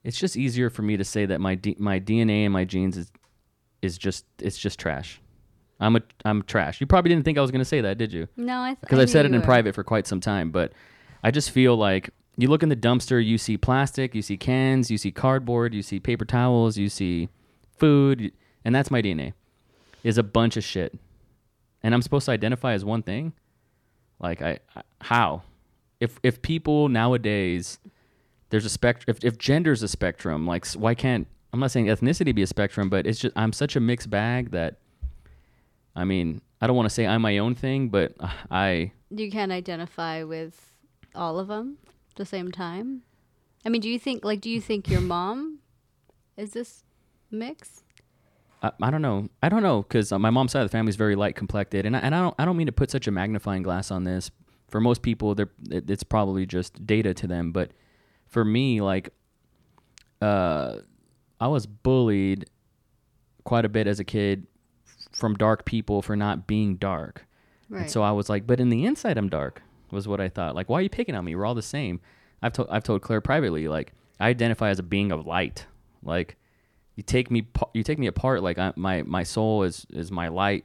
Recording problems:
none

